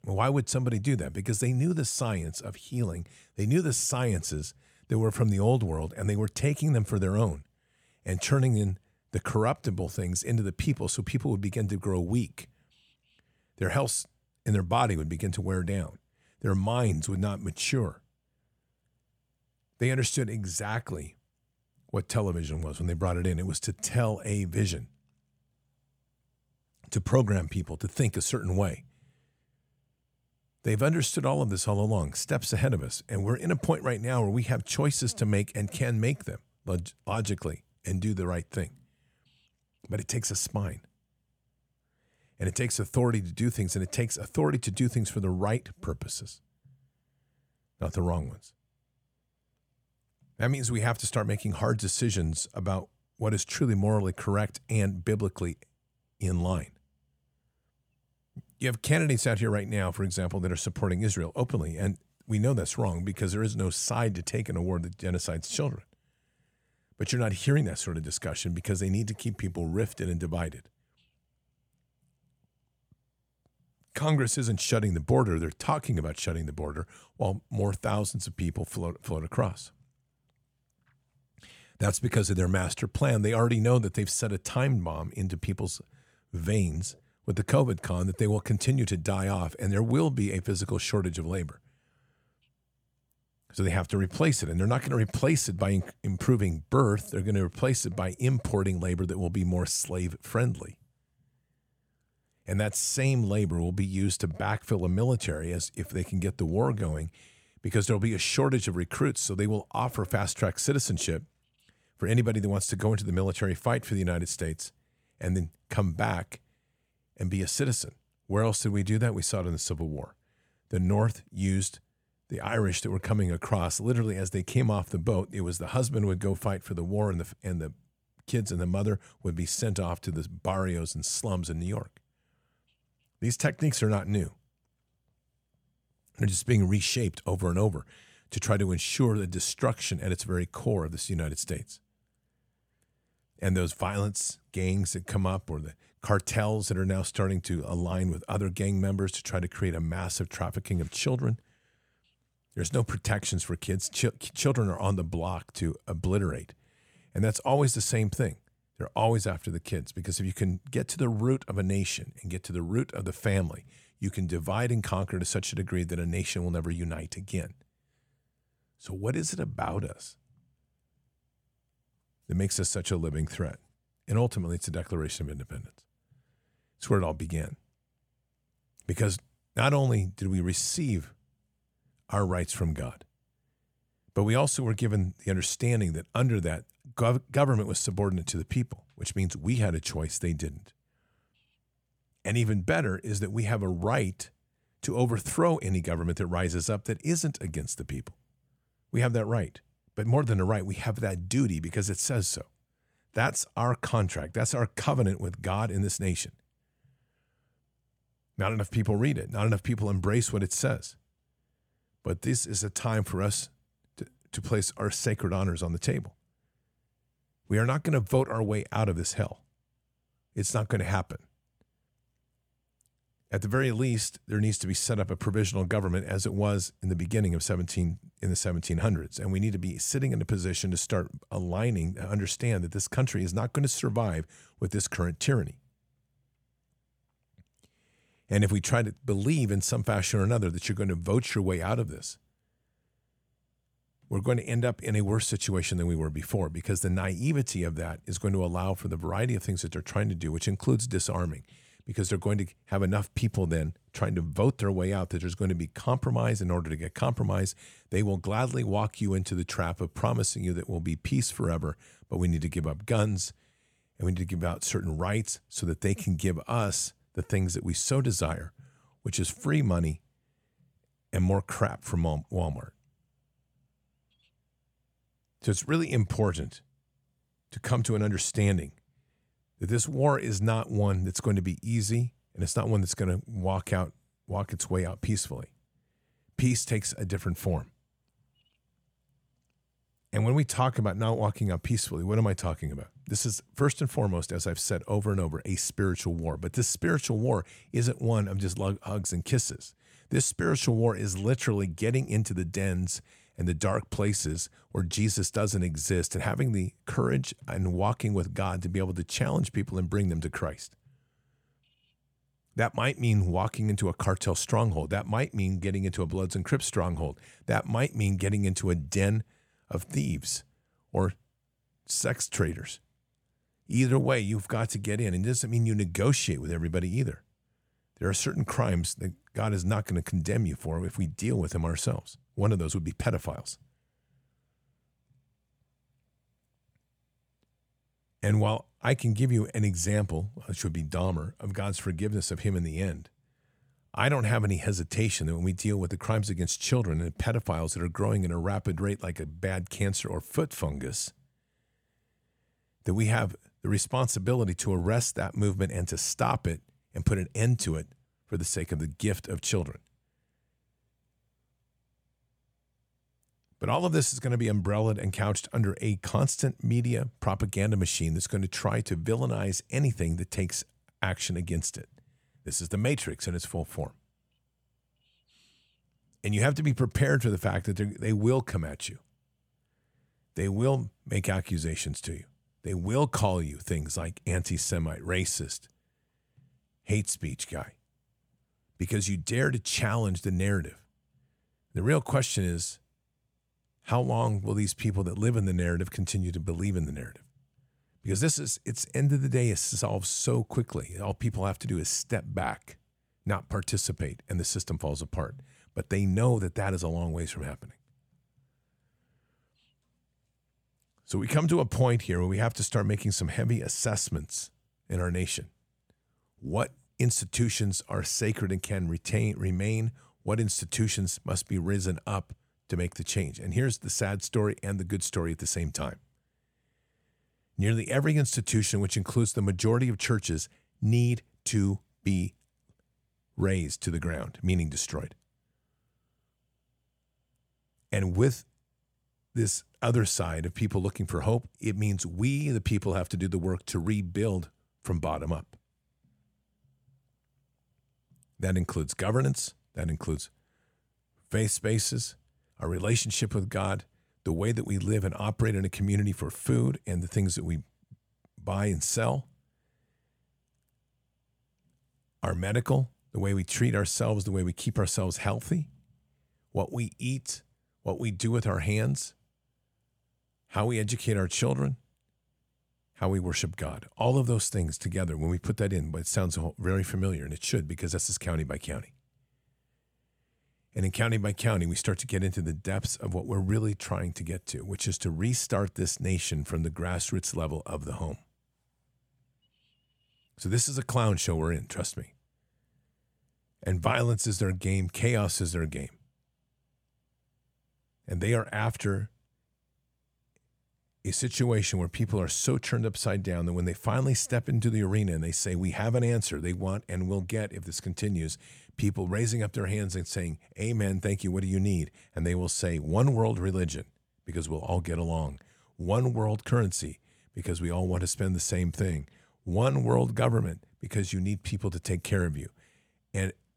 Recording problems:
none

